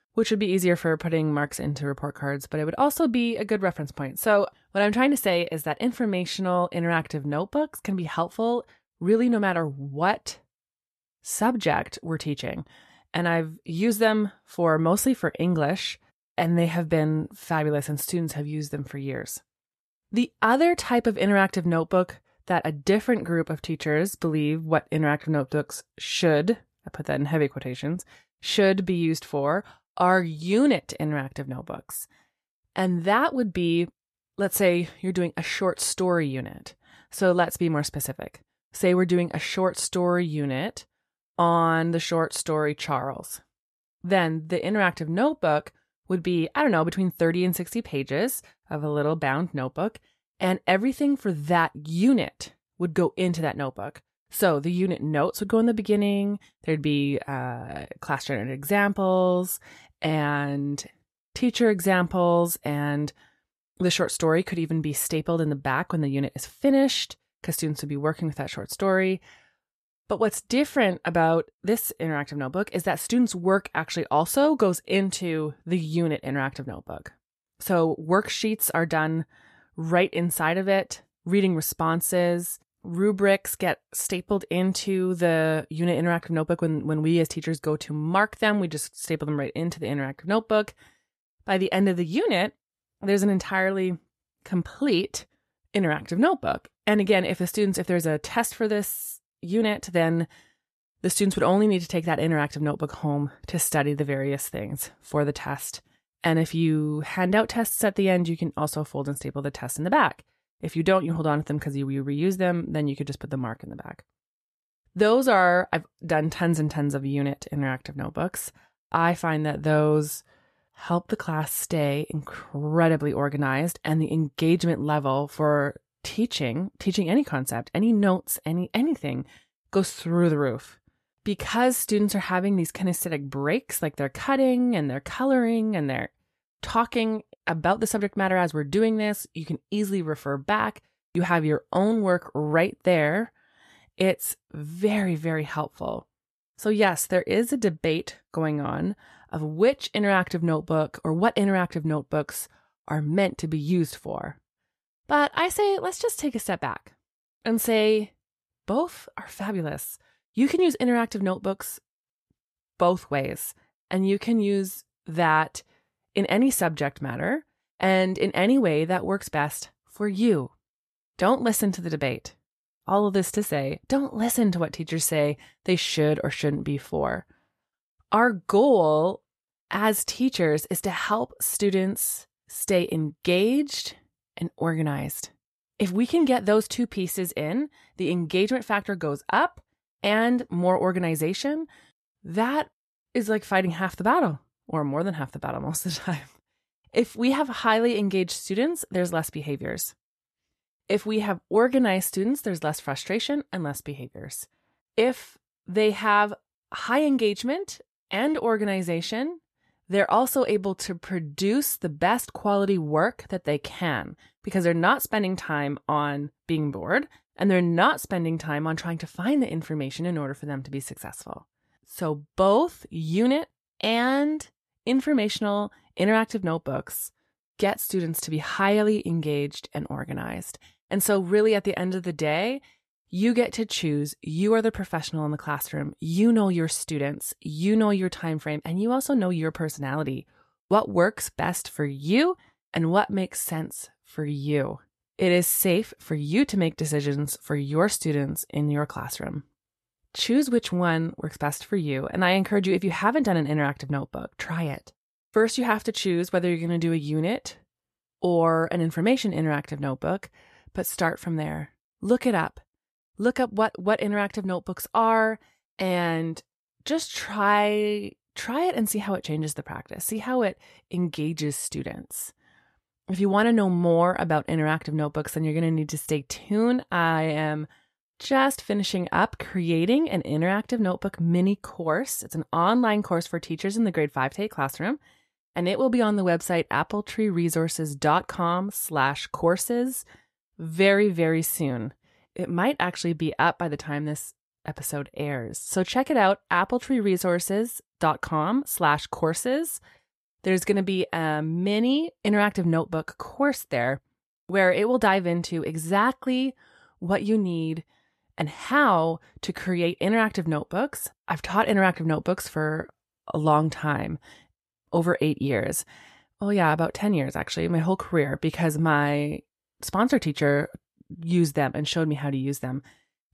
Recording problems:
none

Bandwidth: 13.5 kHz